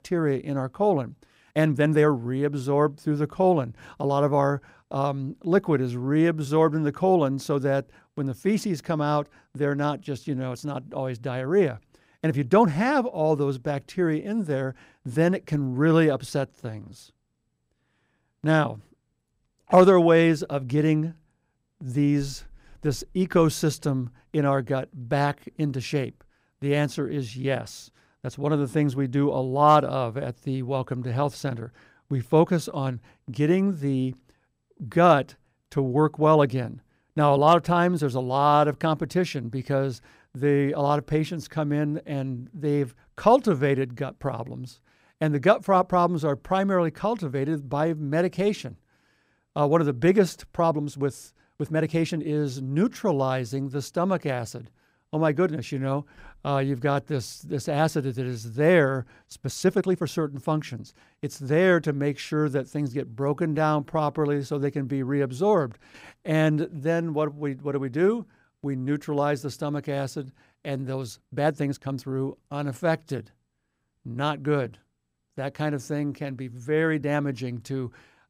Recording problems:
uneven, jittery; strongly; from 1 s to 1:17

